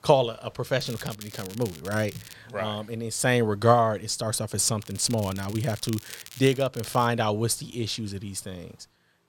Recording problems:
crackling; noticeable; from 1 to 2.5 s and from 5 to 7 s; 15 dB below the speech

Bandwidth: 17 kHz